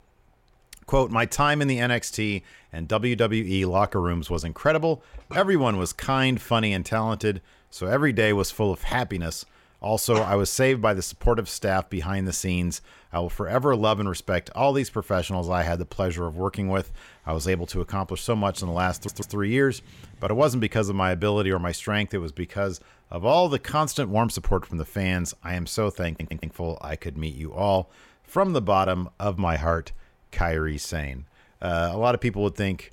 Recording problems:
audio stuttering; at 19 s and at 26 s

